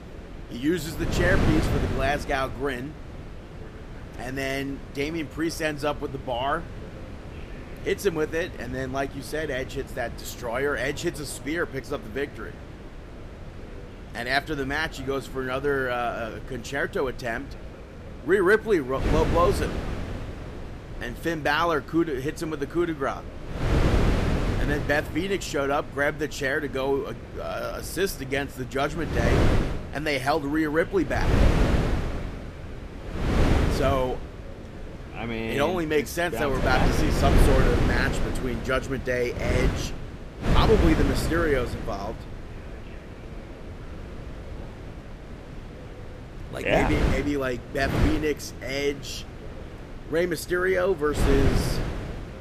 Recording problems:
wind noise on the microphone; heavy; 7 dB below the speech
voice in the background; faint; throughout; 25 dB below the speech

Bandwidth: 14.5 kHz